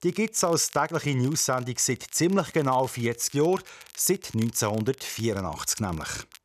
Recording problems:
crackle, like an old record; faint; 25 dB below the speech

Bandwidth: 14 kHz